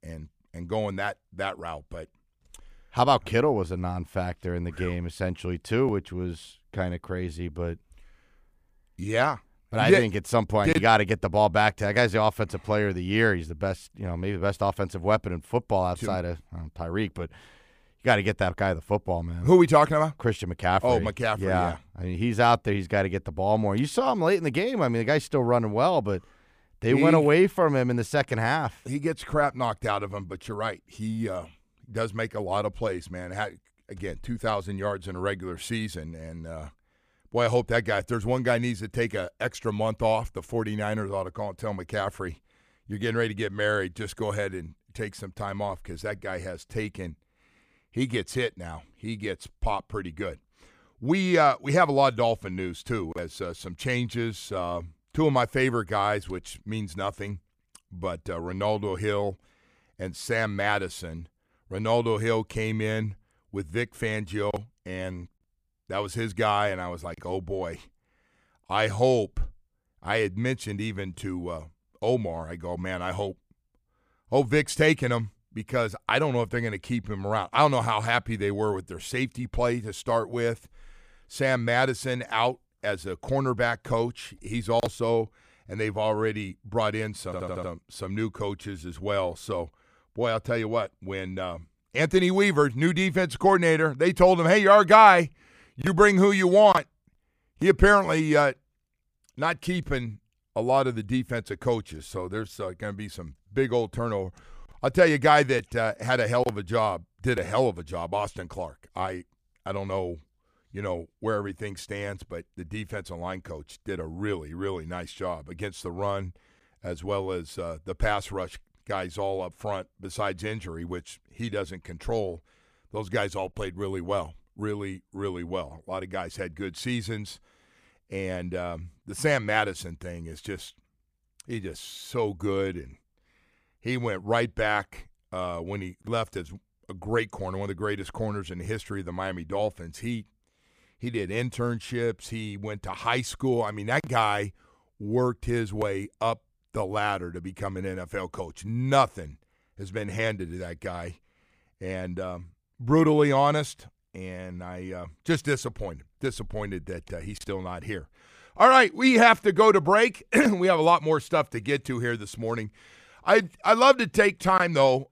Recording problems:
audio stuttering; at 1:27

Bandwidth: 15 kHz